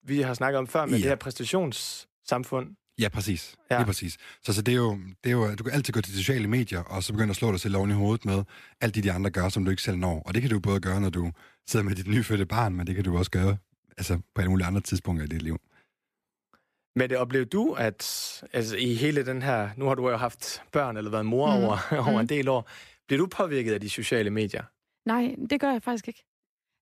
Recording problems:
none

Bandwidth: 14.5 kHz